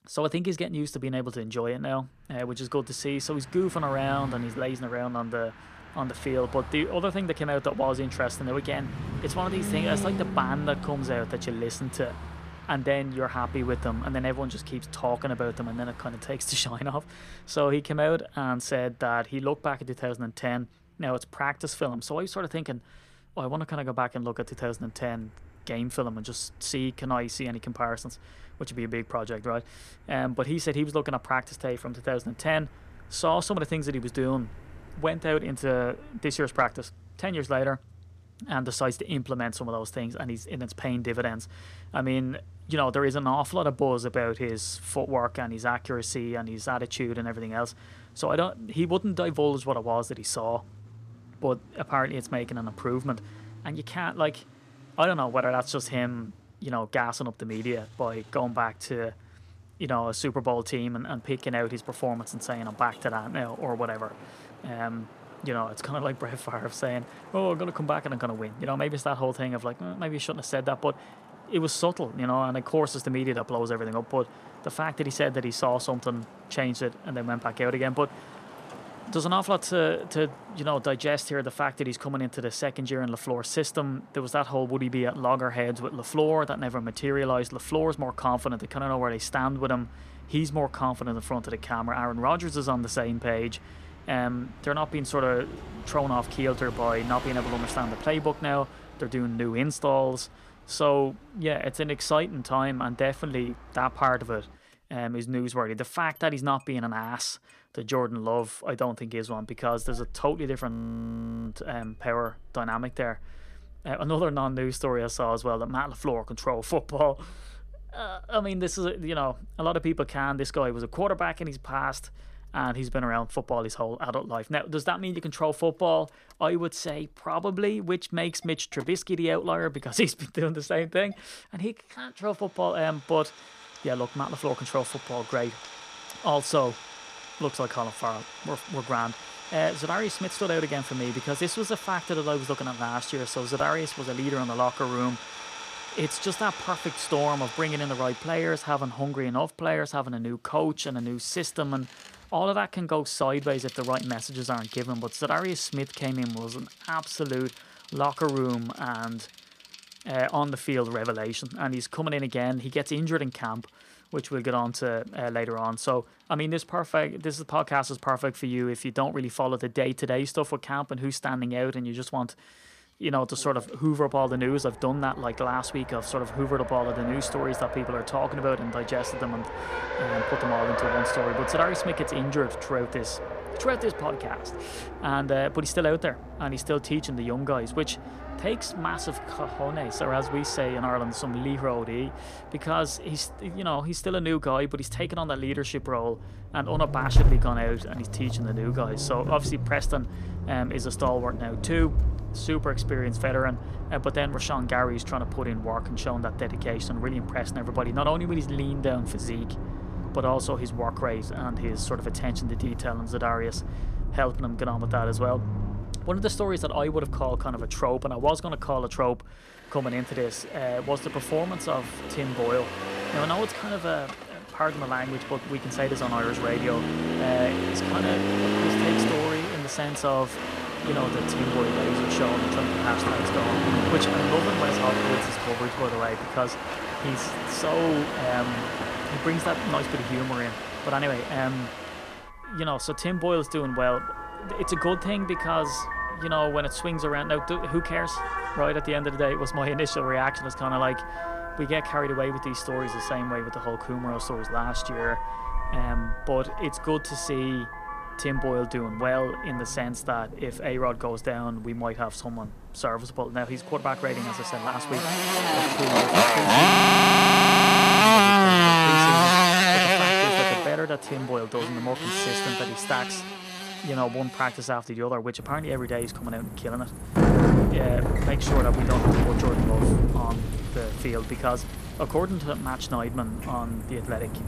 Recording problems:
traffic noise; very loud; throughout; 1 dB above the speech
audio freezing; at 1:51 for 1 s and at 4:27 for 1.5 s

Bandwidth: 14.5 kHz